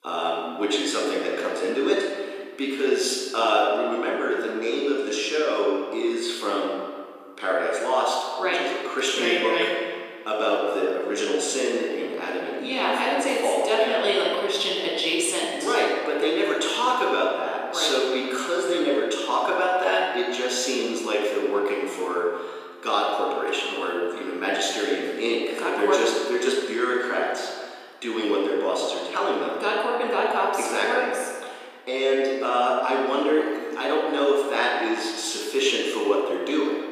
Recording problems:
off-mic speech; far
room echo; noticeable; dies away in 1.7 s
thin; somewhat; fading below 300 Hz

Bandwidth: 14.5 kHz